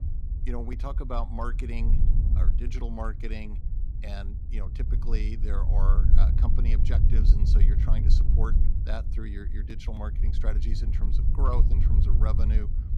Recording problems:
low rumble; loud; throughout; 5 dB below the speech

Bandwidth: 15 kHz